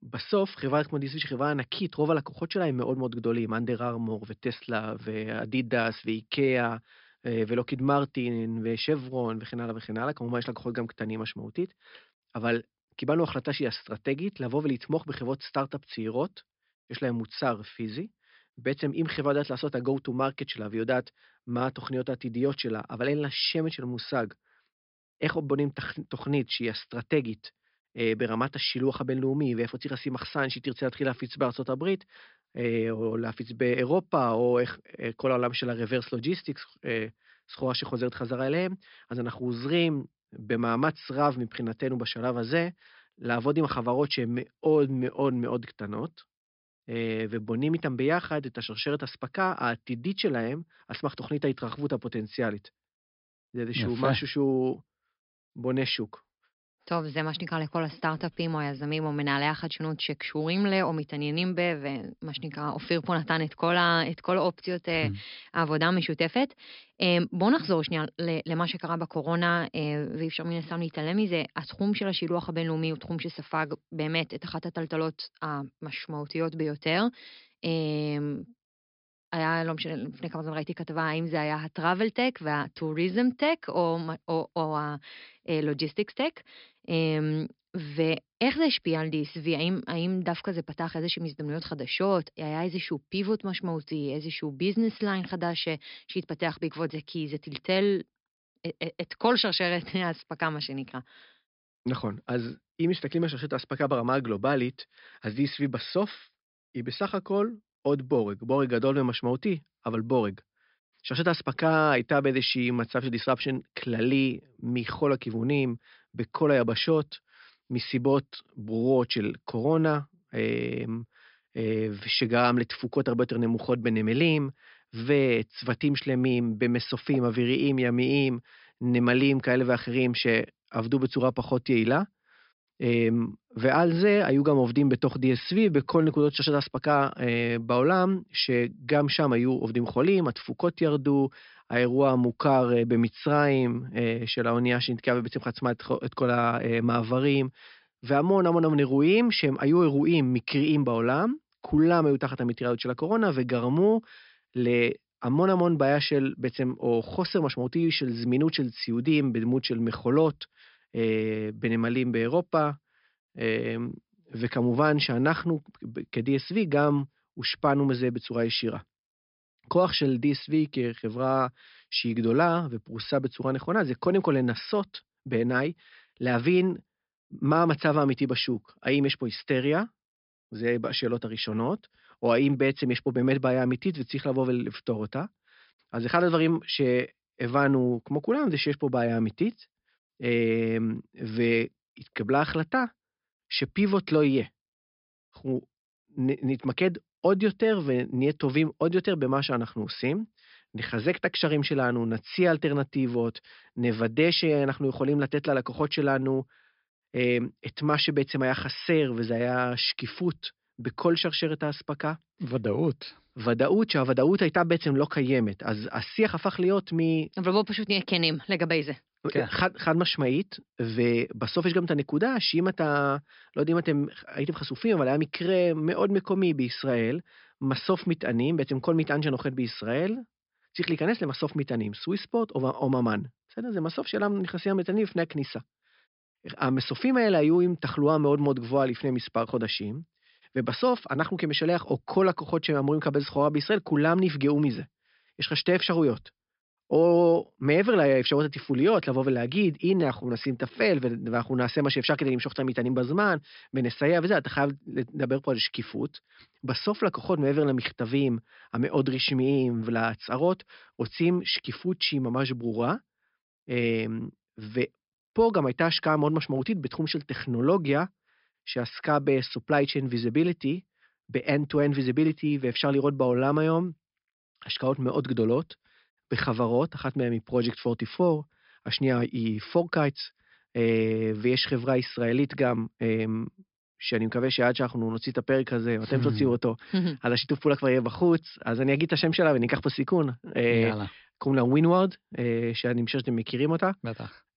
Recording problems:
high frequencies cut off; noticeable; nothing above 5.5 kHz
uneven, jittery; strongly; from 44 s to 4:11

